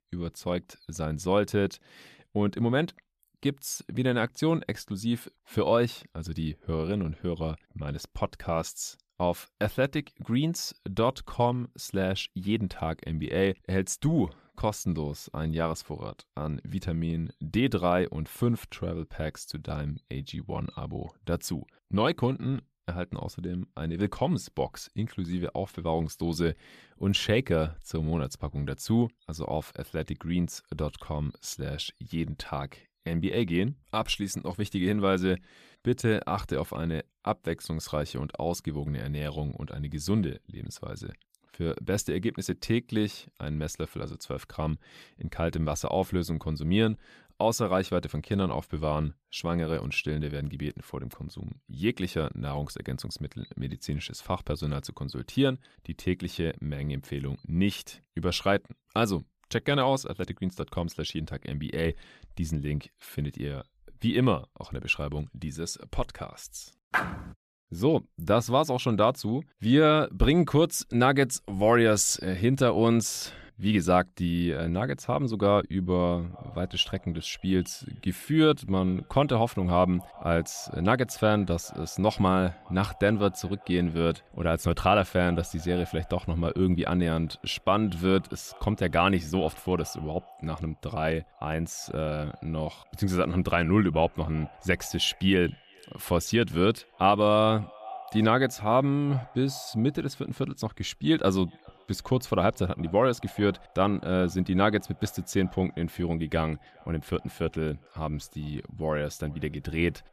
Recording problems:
echo of what is said; faint; from 1:16 on; 410 ms later, 25 dB below the speech

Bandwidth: 14.5 kHz